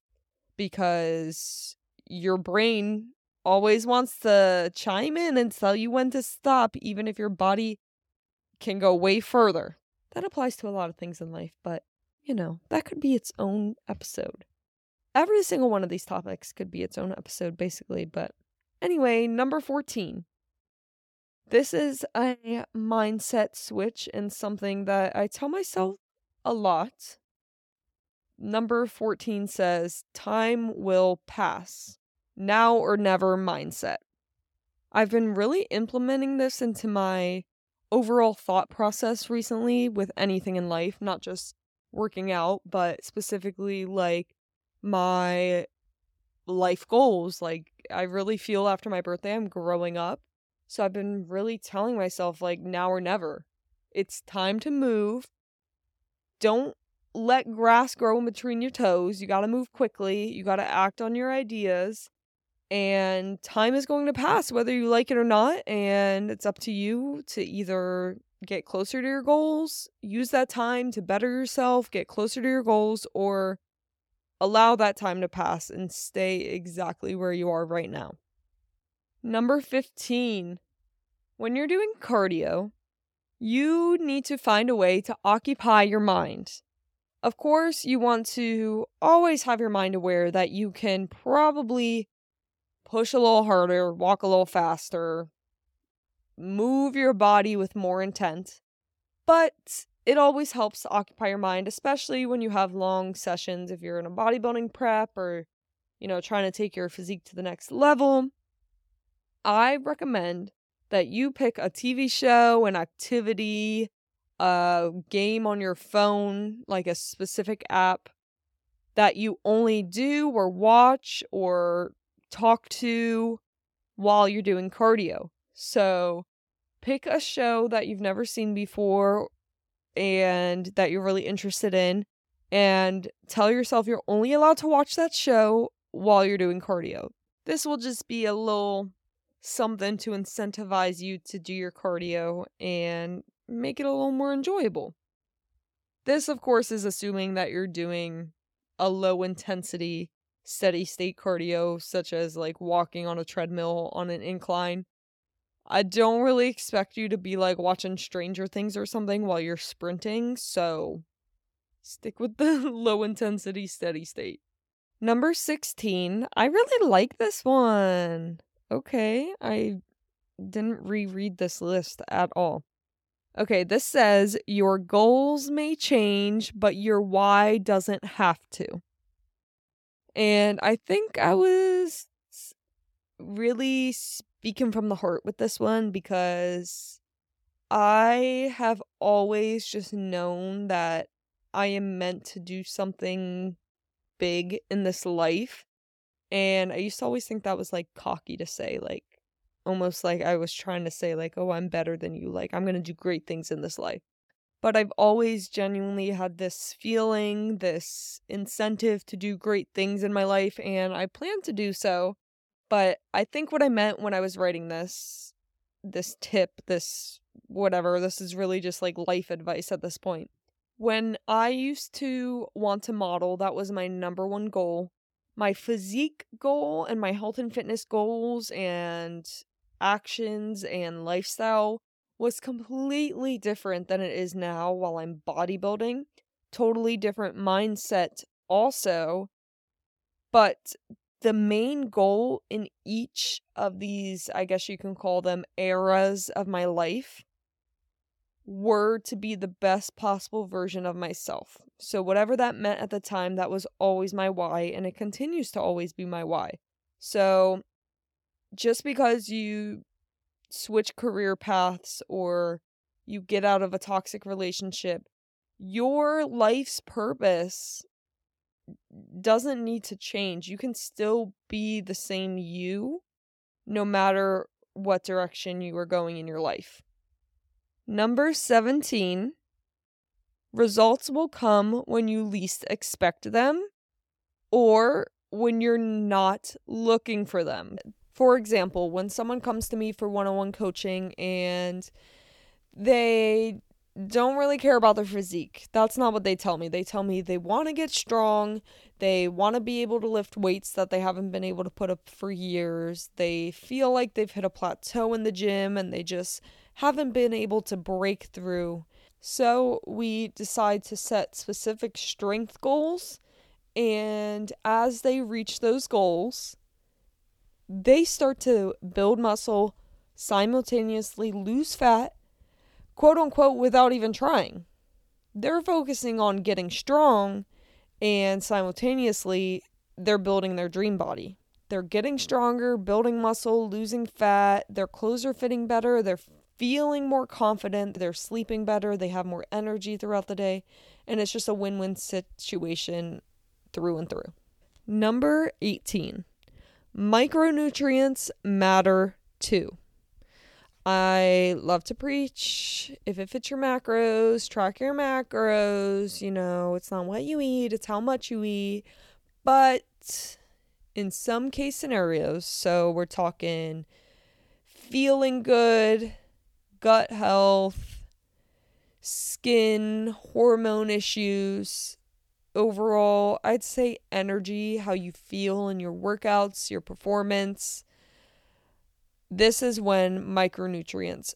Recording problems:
none

